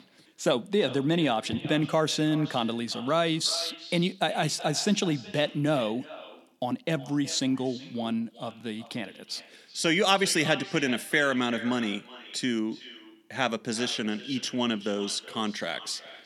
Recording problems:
echo of what is said; noticeable; throughout; 370 ms later, 15 dB below the speech

